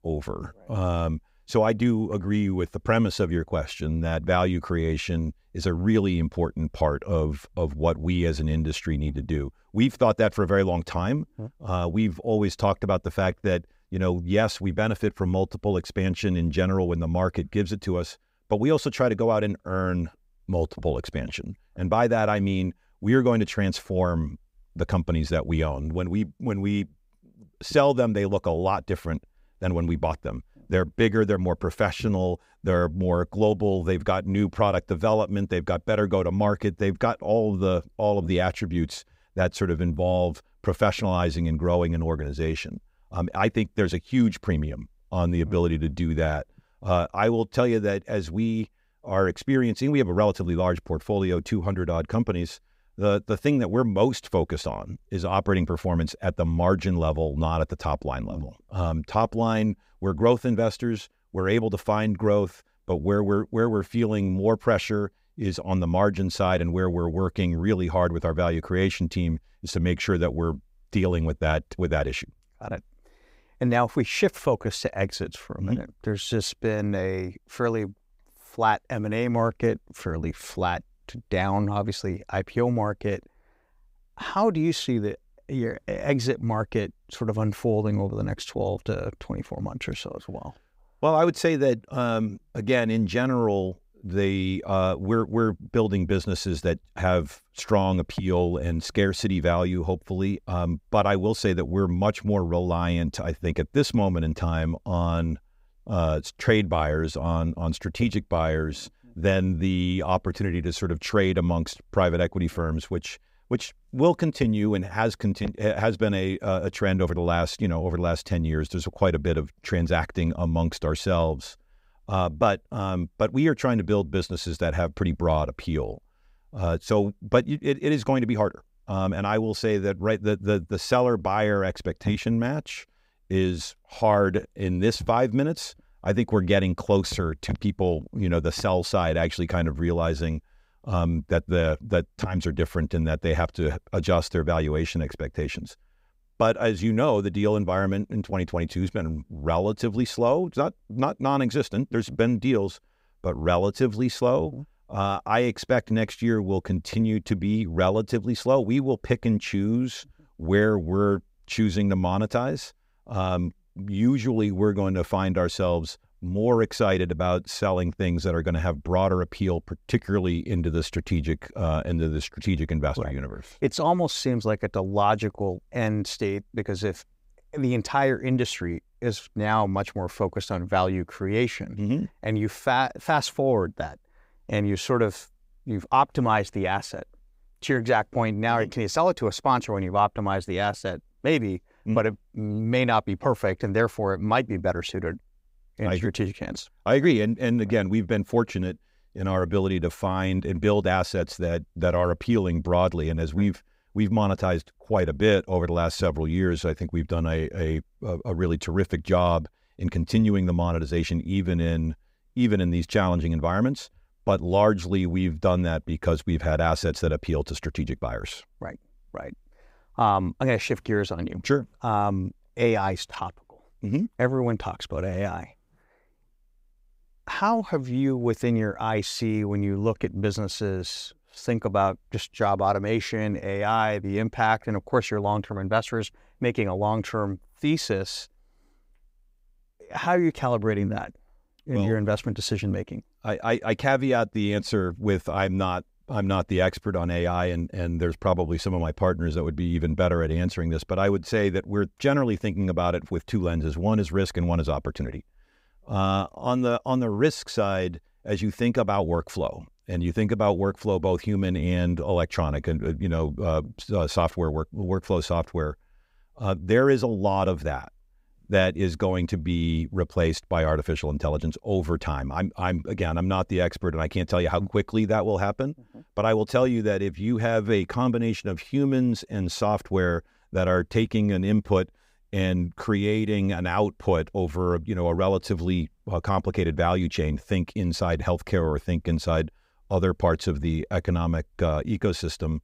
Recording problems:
none

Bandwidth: 15.5 kHz